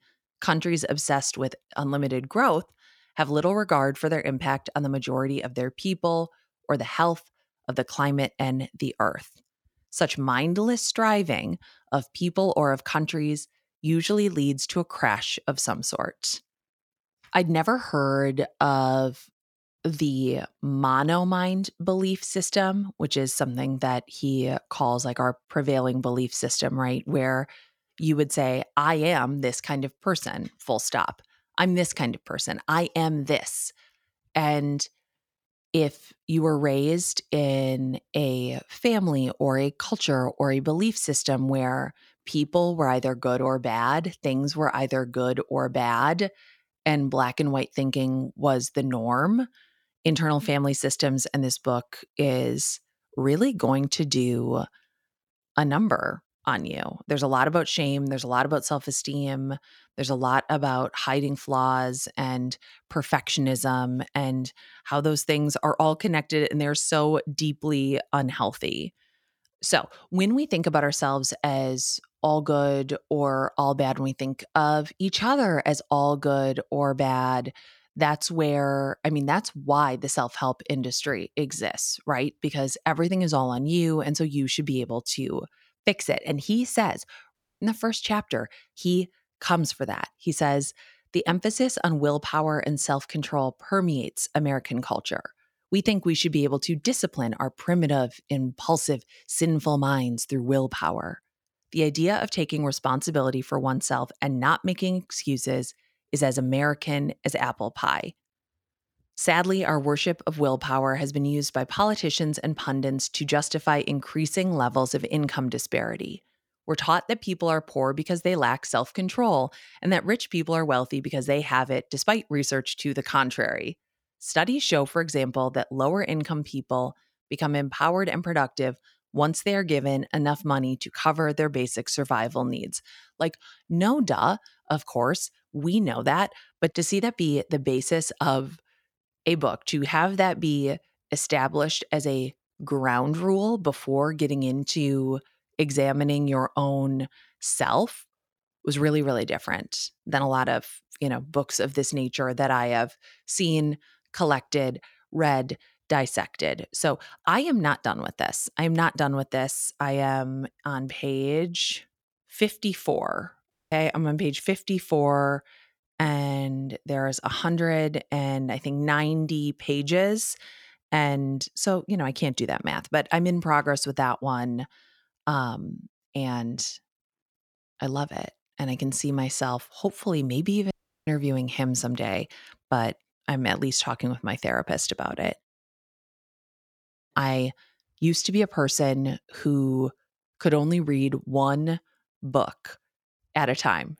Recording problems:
audio cutting out; at 1:27, at 2:44 and at 3:01

